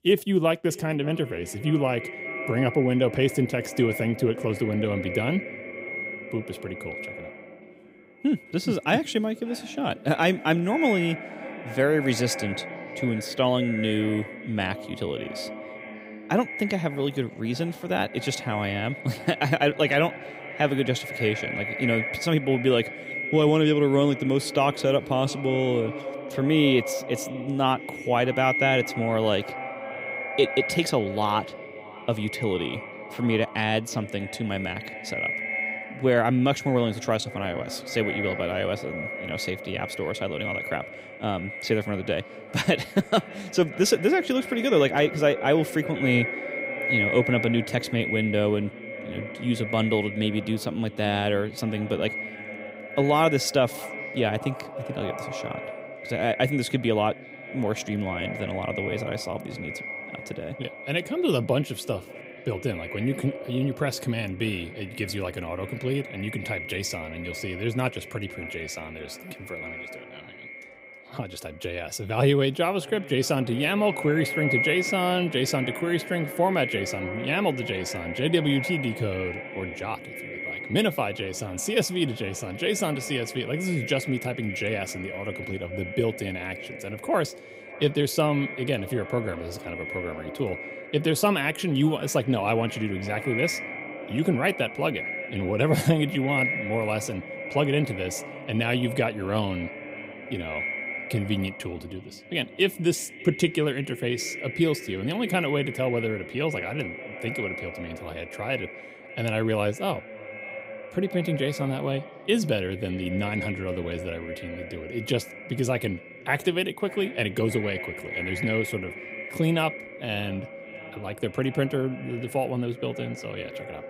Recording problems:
echo of what is said; strong; throughout; 590 ms later, 8 dB below the speech

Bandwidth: 15.5 kHz